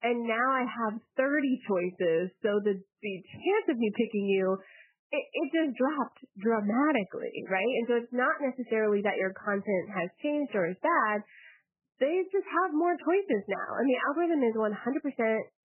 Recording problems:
garbled, watery; badly; nothing above 3 kHz

